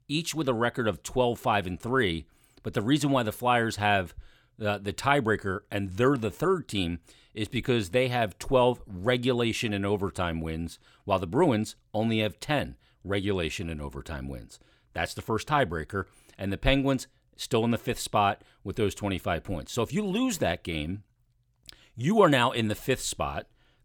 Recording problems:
none

